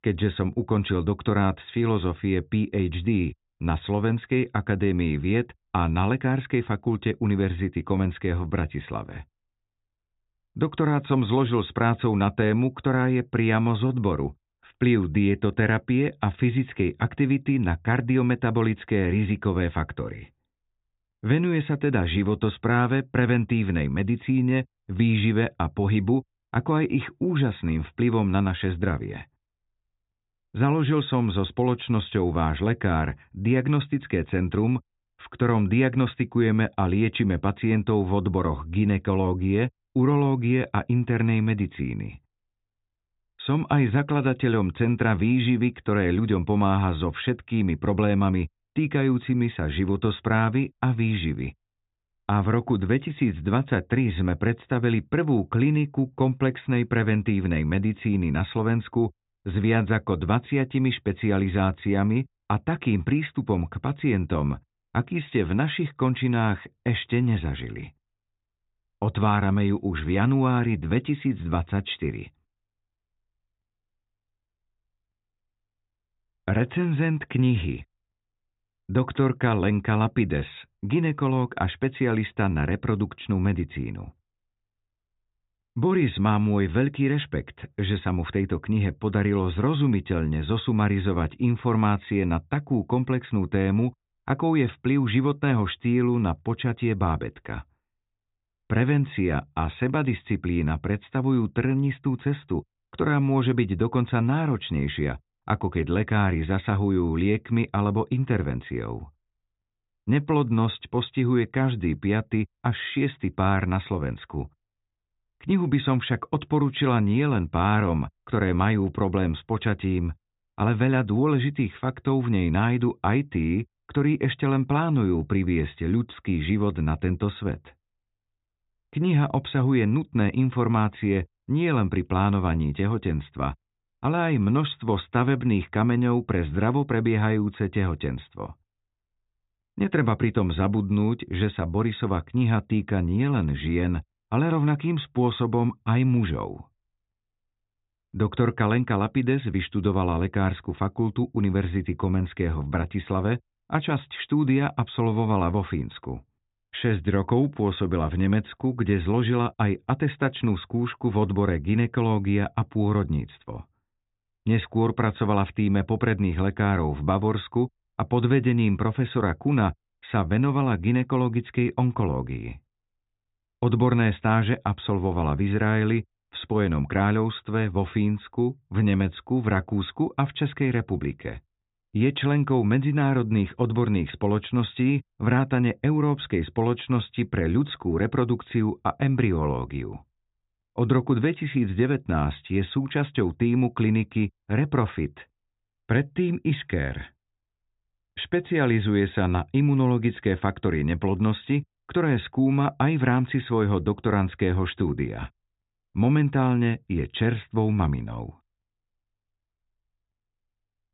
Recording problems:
high frequencies cut off; severe; nothing above 4 kHz

